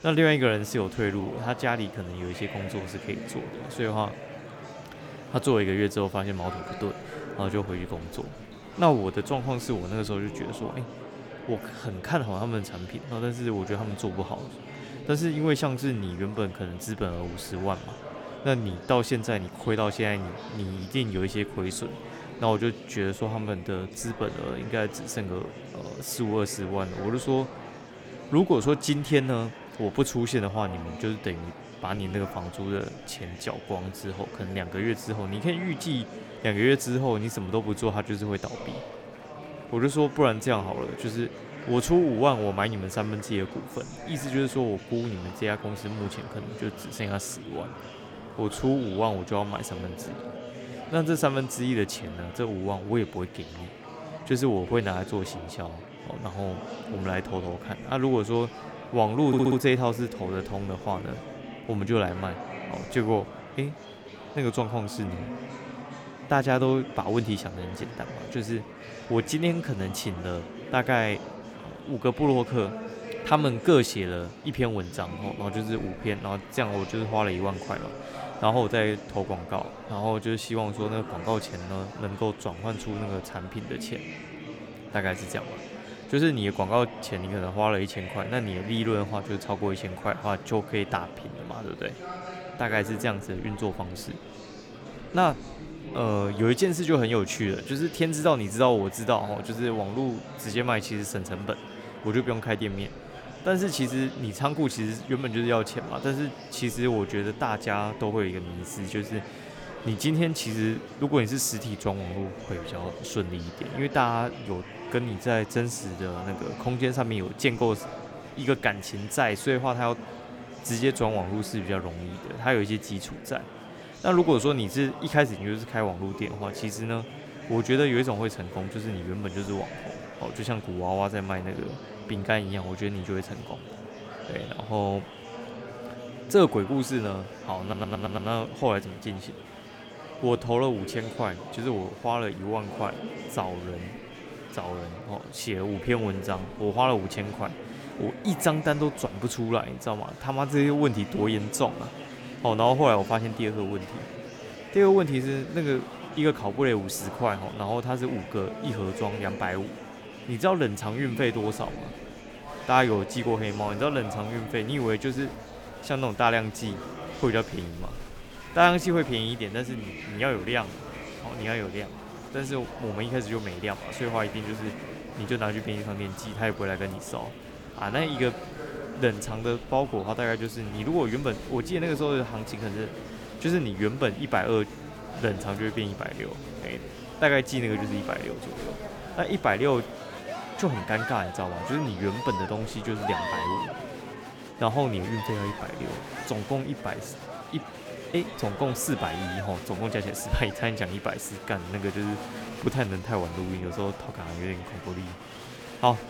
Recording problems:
murmuring crowd; noticeable; throughout; 10 dB below the speech
audio stuttering; at 59 s and at 2:18

